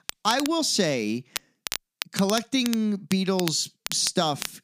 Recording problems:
crackle, like an old record; loud; 10 dB below the speech

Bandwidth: 15 kHz